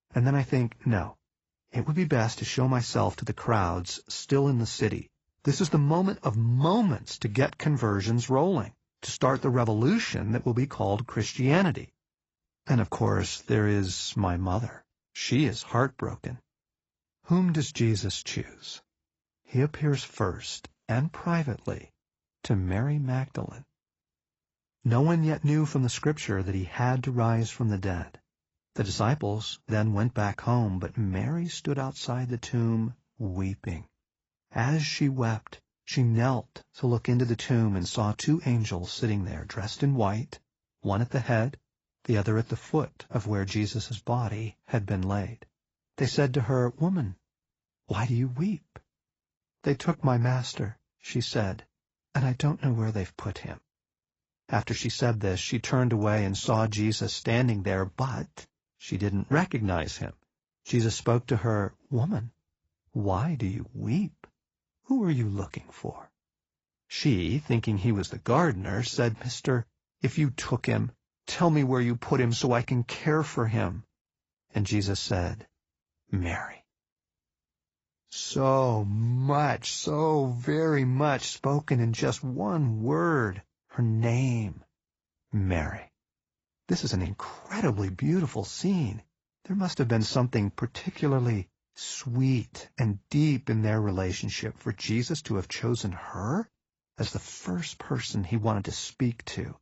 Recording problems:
garbled, watery; badly; nothing above 7.5 kHz

